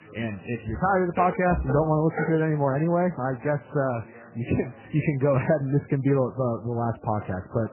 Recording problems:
garbled, watery; badly; nothing above 2.5 kHz
background chatter; faint; throughout; 4 voices, 25 dB below the speech
clattering dishes; noticeable; from 0.5 to 2.5 s; peak 7 dB below the speech

